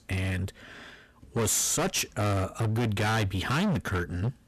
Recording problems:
distortion; heavy; 25% of the sound clipped

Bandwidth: 13.5 kHz